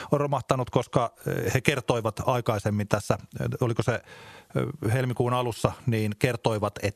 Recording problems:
squashed, flat; somewhat

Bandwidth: 13.5 kHz